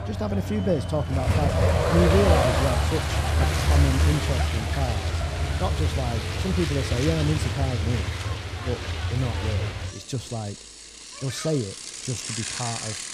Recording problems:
traffic noise; very loud; throughout; 3 dB above the speech

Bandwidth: 14.5 kHz